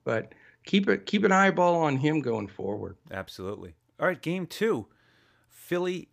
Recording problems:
none

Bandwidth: 15 kHz